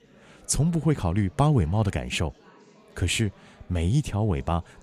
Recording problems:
chatter from many people; faint; throughout; 30 dB below the speech

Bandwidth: 14.5 kHz